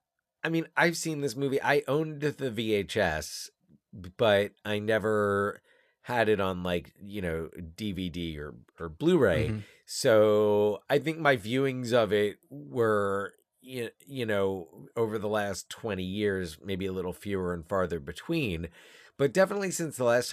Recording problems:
abrupt cut into speech; at the end

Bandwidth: 14.5 kHz